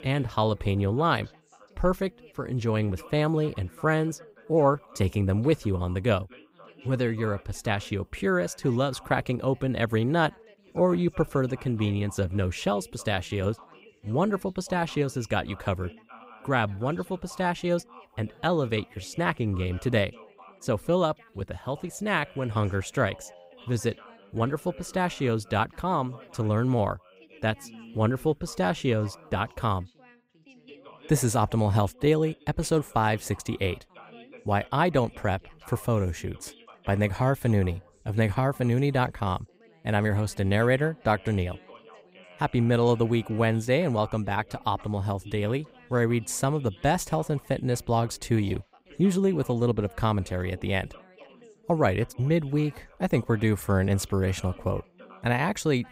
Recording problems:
background chatter; faint; throughout; 3 voices, 25 dB below the speech

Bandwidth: 15.5 kHz